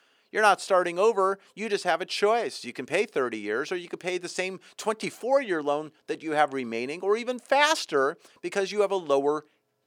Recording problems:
thin; somewhat; fading below 450 Hz

